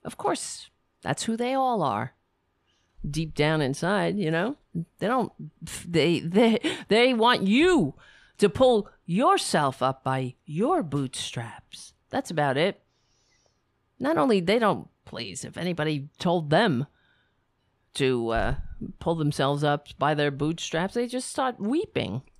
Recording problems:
none

